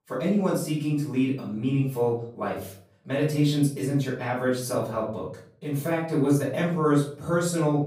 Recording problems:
off-mic speech; far
room echo; noticeable; dies away in 0.5 s

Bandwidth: 15.5 kHz